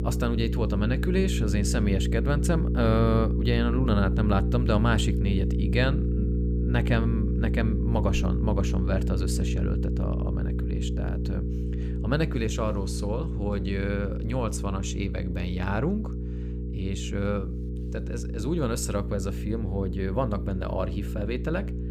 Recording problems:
electrical hum; loud; throughout; 60 Hz, 7 dB below the speech

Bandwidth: 15.5 kHz